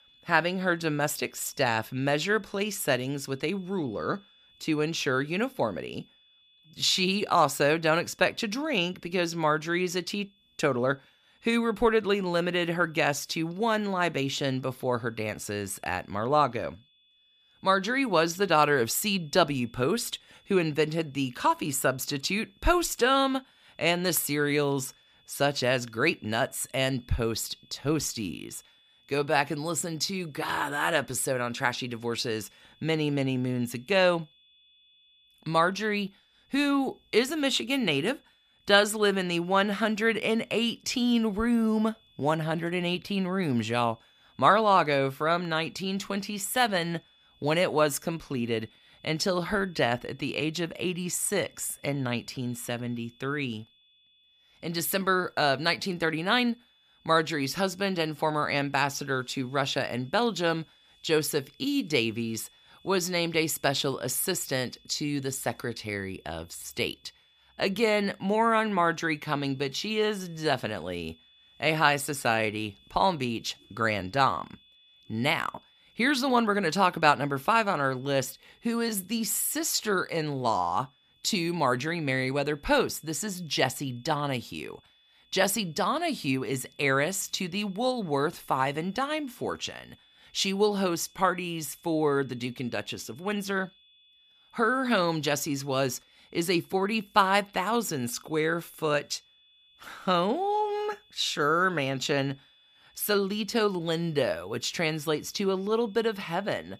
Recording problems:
high-pitched whine; faint; throughout; 3.5 kHz, 30 dB below the speech

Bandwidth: 15 kHz